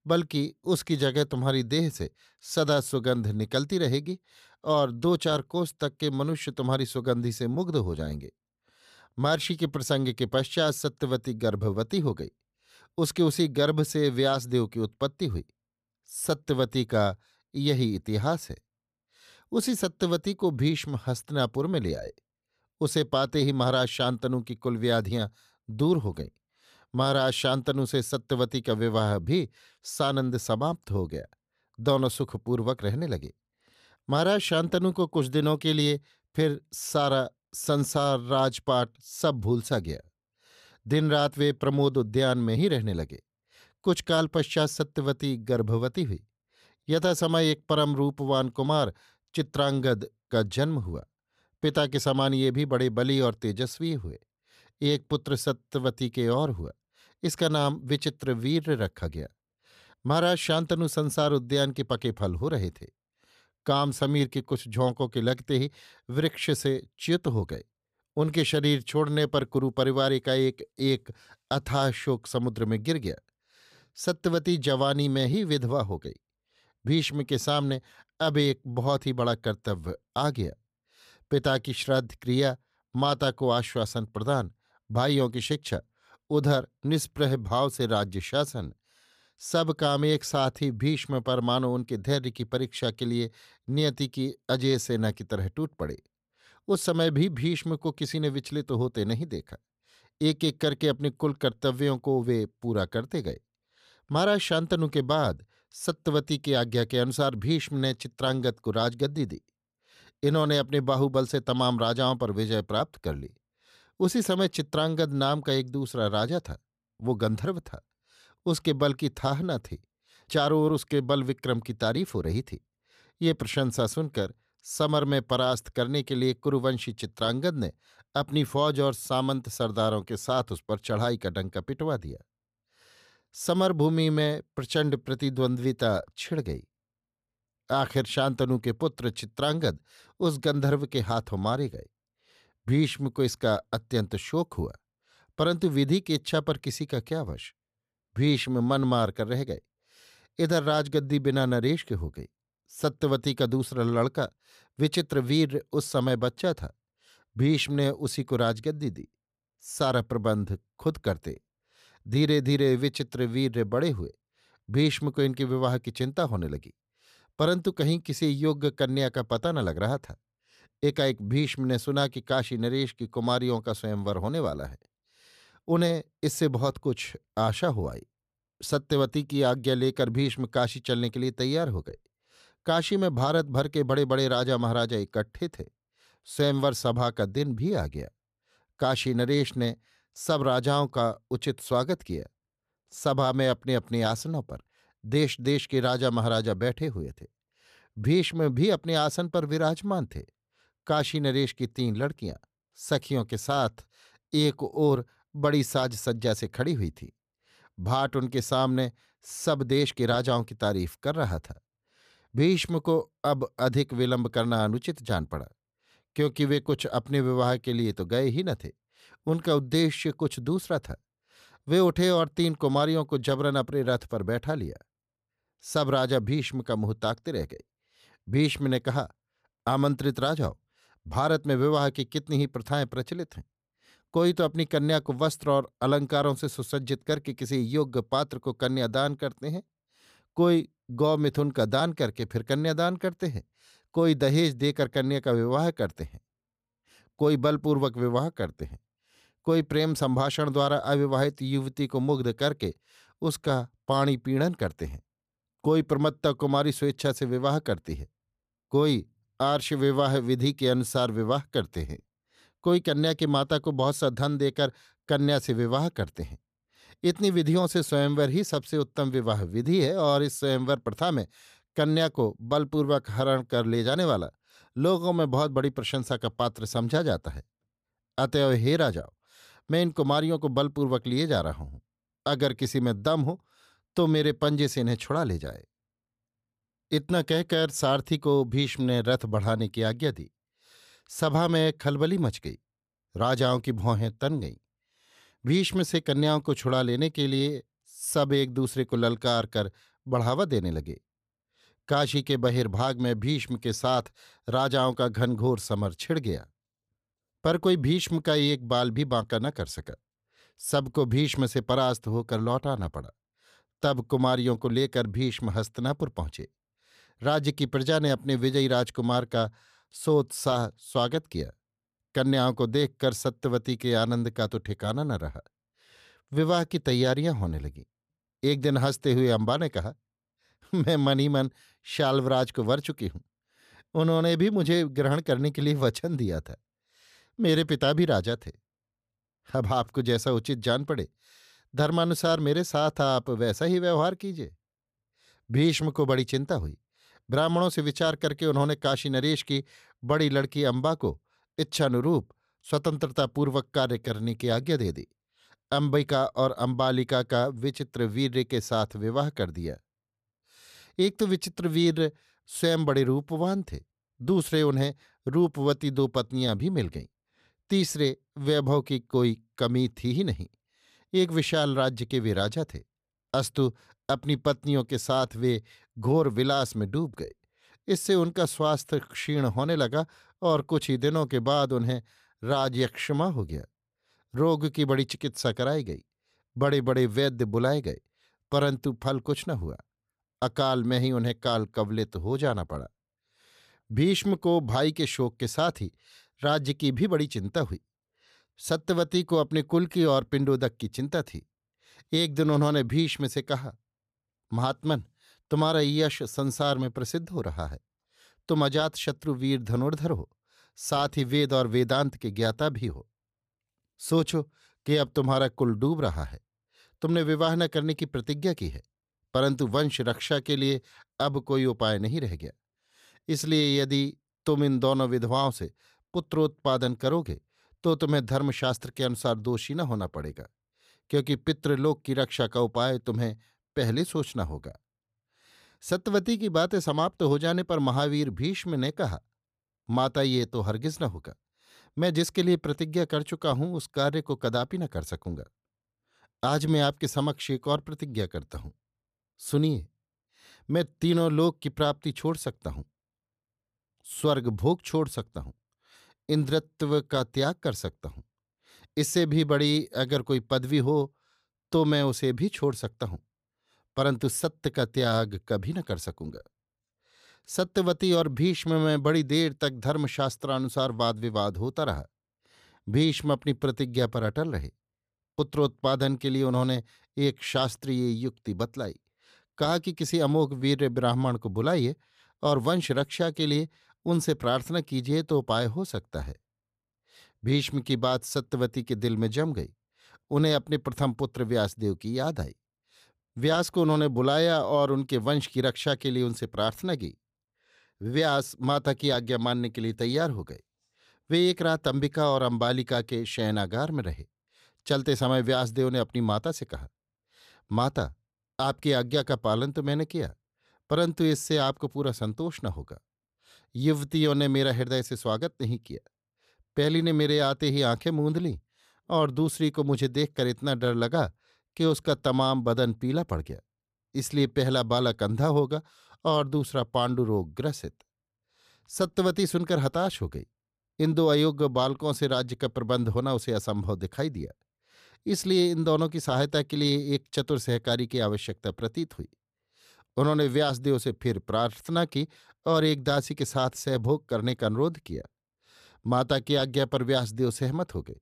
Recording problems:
none

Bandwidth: 14.5 kHz